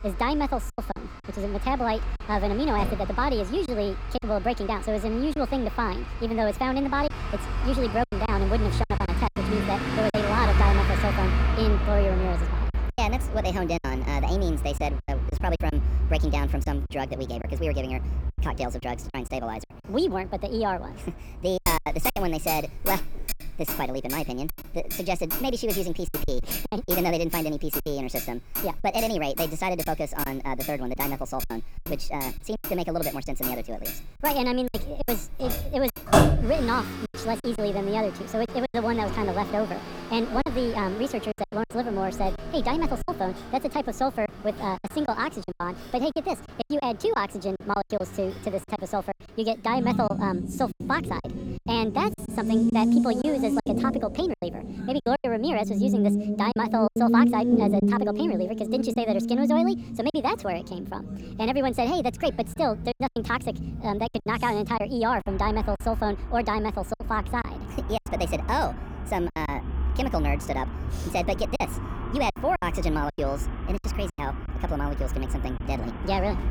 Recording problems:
wrong speed and pitch; too fast and too high; 1.5 times normal speed
traffic noise; loud; throughout; 2 dB below the speech
choppy; very; 8% of the speech affected

